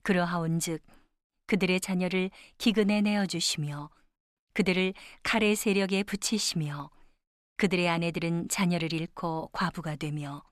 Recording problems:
none

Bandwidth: 13.5 kHz